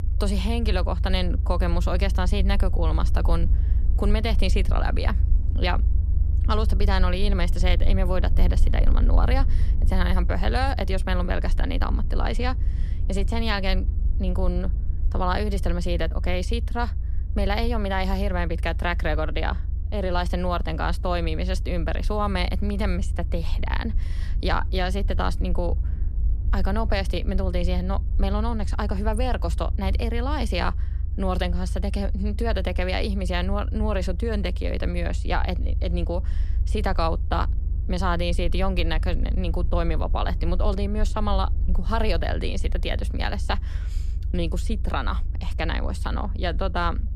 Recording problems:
low rumble; noticeable; throughout; 15 dB below the speech

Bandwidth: 14 kHz